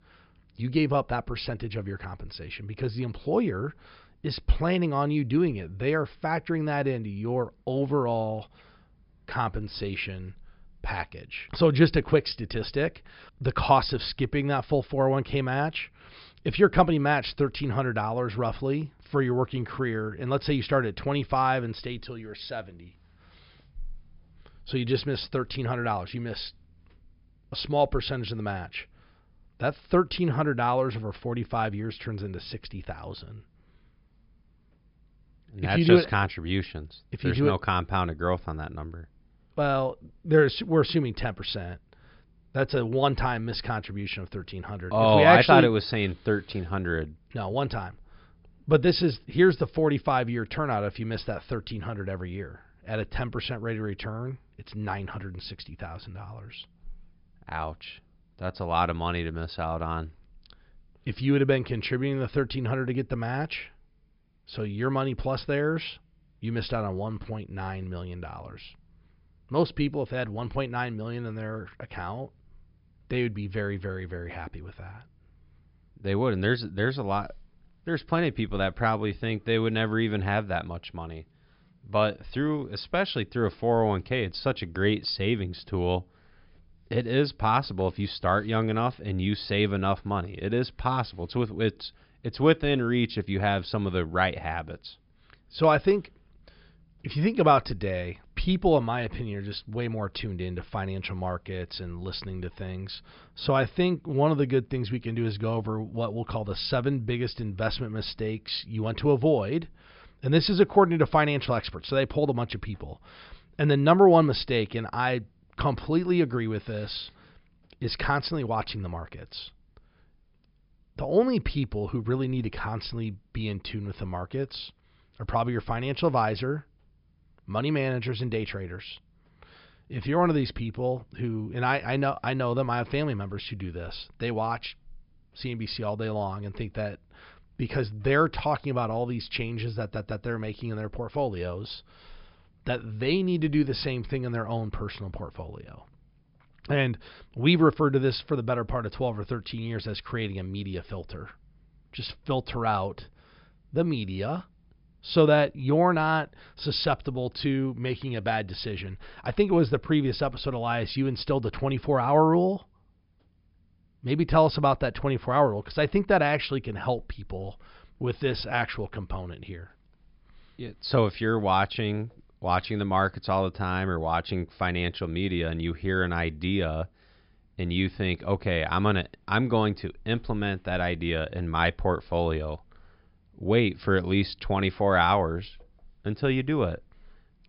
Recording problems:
high frequencies cut off; noticeable; nothing above 5.5 kHz
audio stuttering; at 2:20

